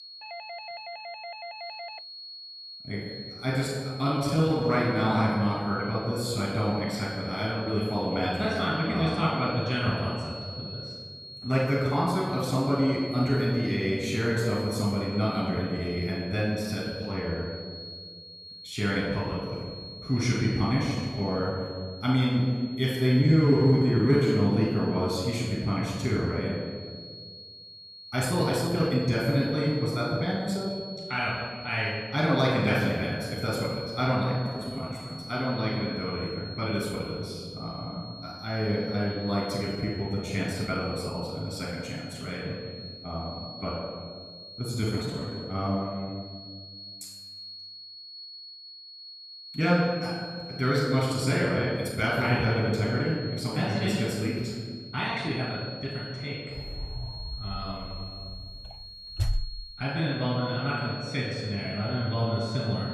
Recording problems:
off-mic speech; far
room echo; noticeable; dies away in 1.7 s
high-pitched whine; noticeable; throughout; 4.5 kHz, 15 dB below the speech
doorbell; faint; until 2 s; peak 10 dB below the speech
uneven, jittery; strongly; from 4 to 58 s
door banging; noticeable; from 57 s to 1:00; peak 3 dB below the speech

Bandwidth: 14 kHz